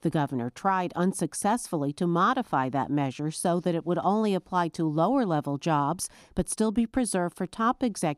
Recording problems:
none

